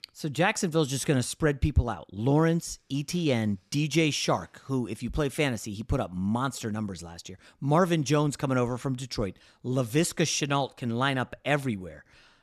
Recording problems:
none

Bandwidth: 13.5 kHz